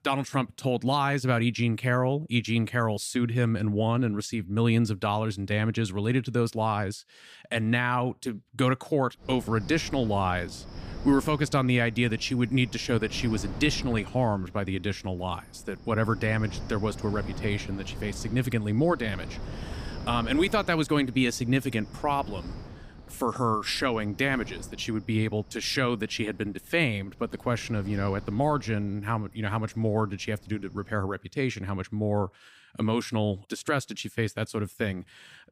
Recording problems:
wind noise on the microphone; occasional gusts; from 9 to 31 s; 20 dB below the speech

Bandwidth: 15 kHz